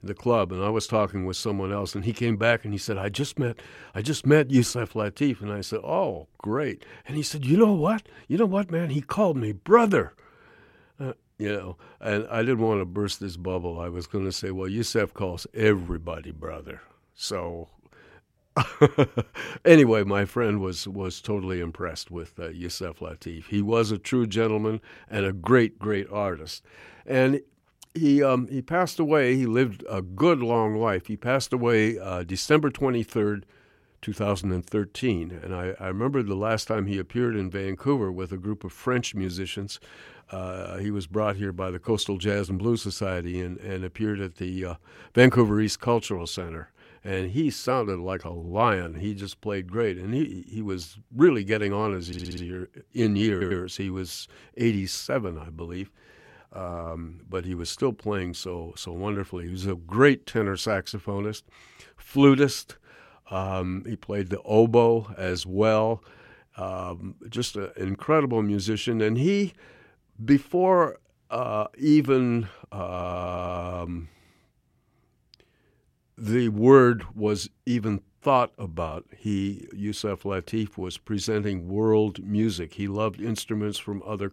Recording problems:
audio stuttering; at 52 s, at 53 s and at 1:13

